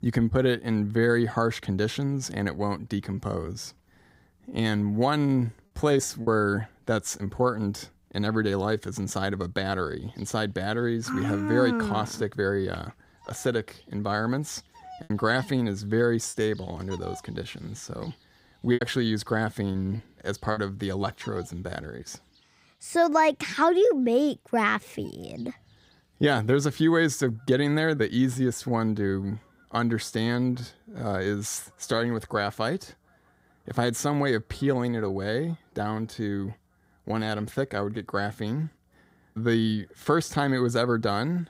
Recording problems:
animal sounds; faint; throughout; 30 dB below the speech
choppy; very; at 6 s, from 15 to 16 s and from 19 to 21 s; 7% of the speech affected

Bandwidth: 15.5 kHz